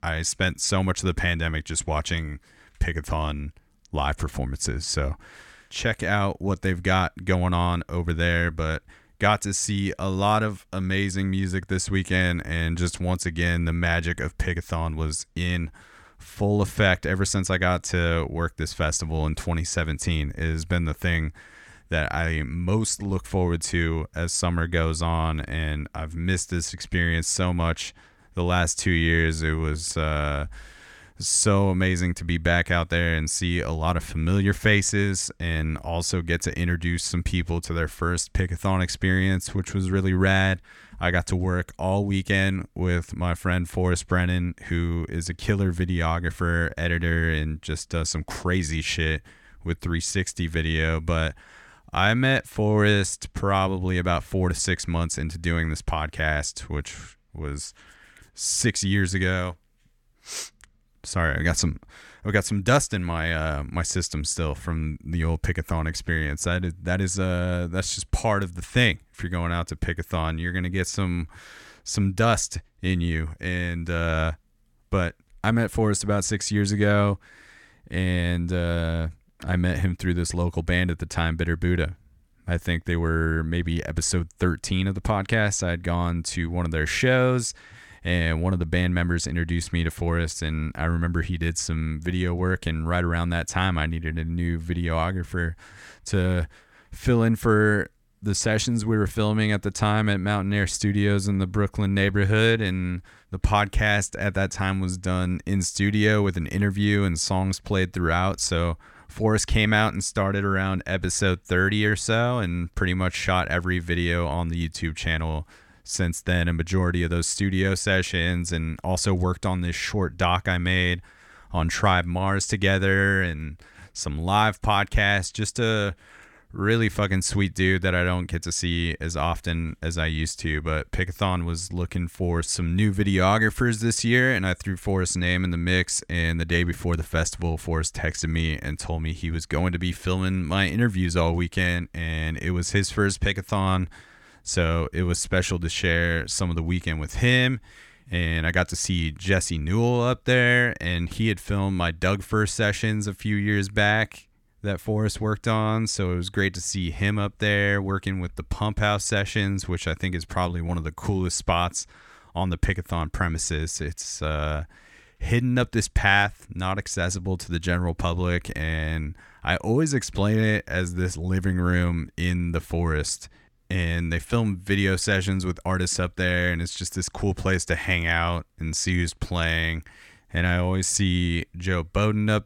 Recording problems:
none

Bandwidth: 17 kHz